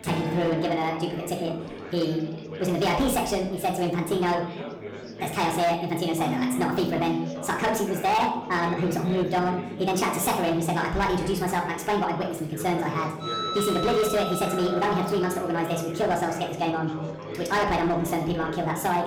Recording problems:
wrong speed and pitch; too fast and too high; 1.5 times normal speed
room echo; slight; dies away in 0.6 s
distortion; slight; 8% of the sound clipped
off-mic speech; somewhat distant
background music; loud; throughout; 9 dB below the speech
chatter from many people; noticeable; throughout; 10 dB below the speech

